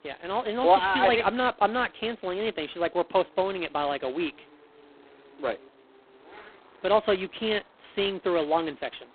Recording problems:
phone-call audio; poor line; nothing above 3.5 kHz
traffic noise; faint; throughout; 30 dB below the speech

